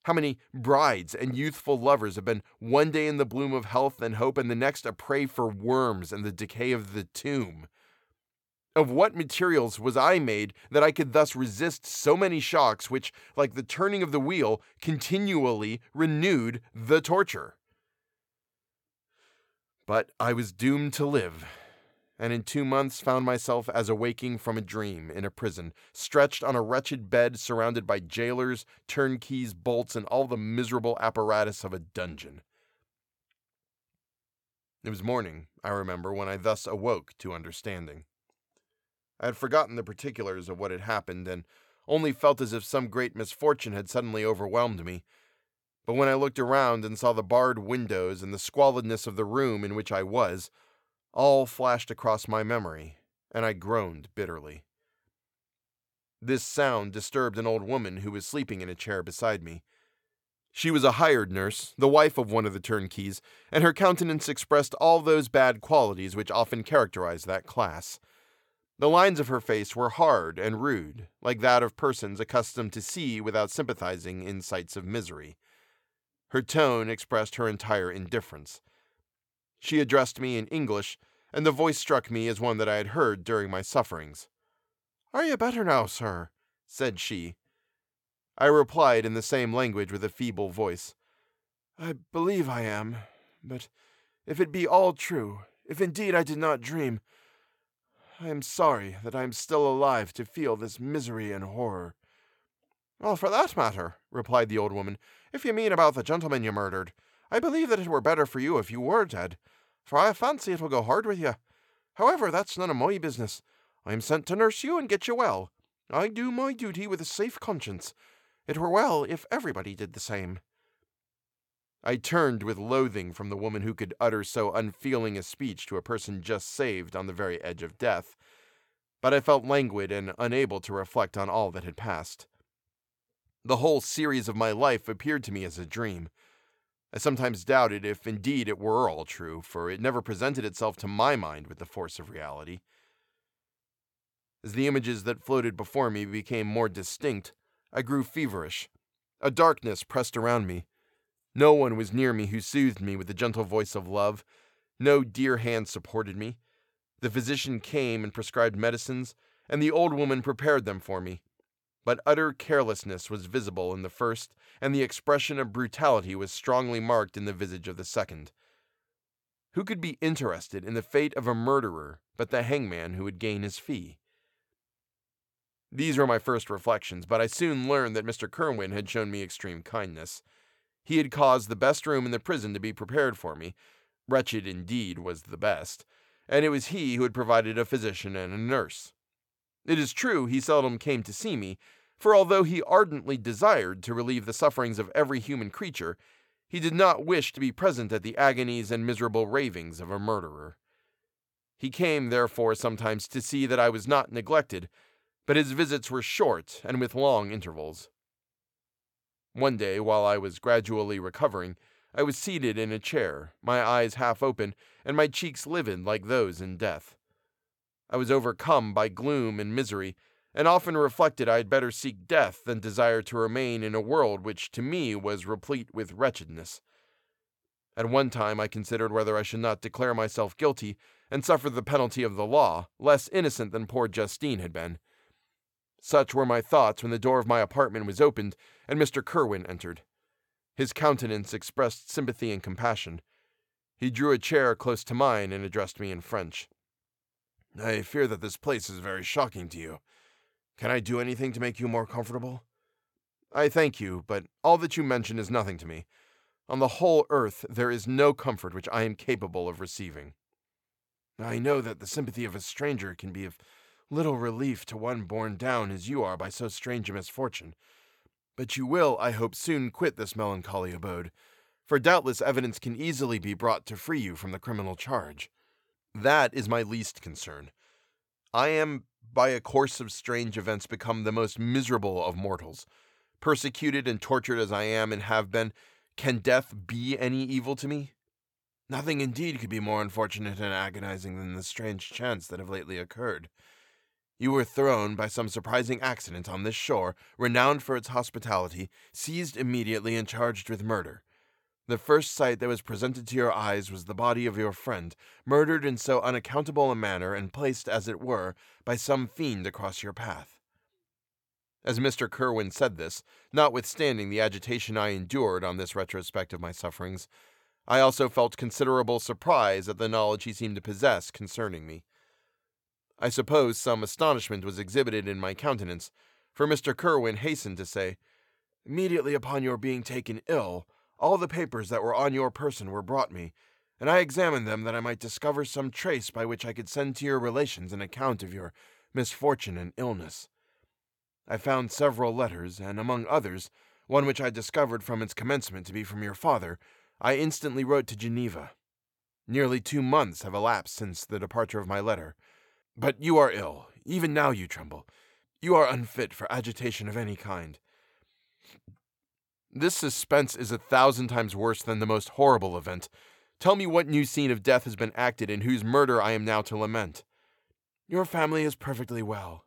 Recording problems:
none

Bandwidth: 17.5 kHz